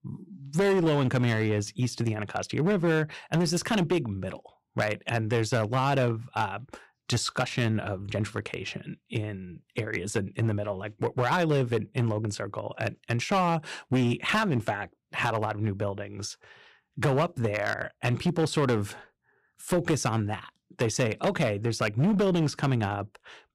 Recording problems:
distortion; slight; 8% of the sound clipped

